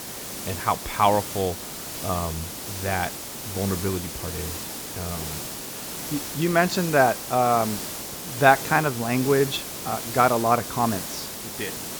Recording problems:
high frequencies cut off; slight; nothing above 8 kHz
hiss; loud; throughout; 7 dB below the speech

